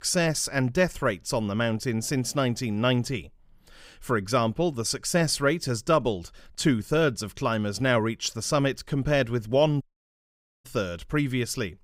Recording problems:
audio cutting out; at 10 s for 1 s

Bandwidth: 15.5 kHz